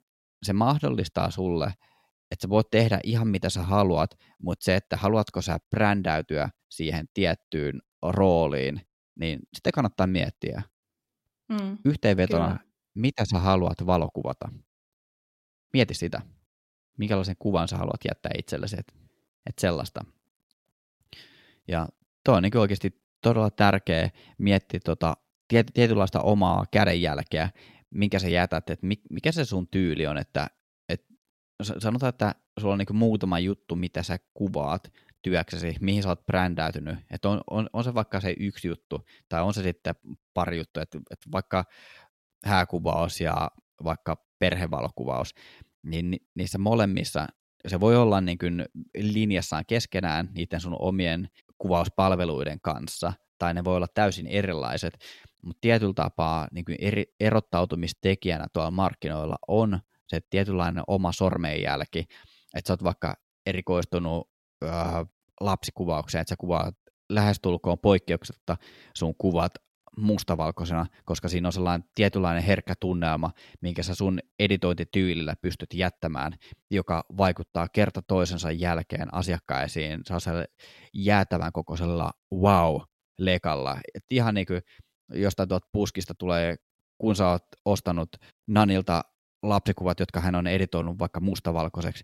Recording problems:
none

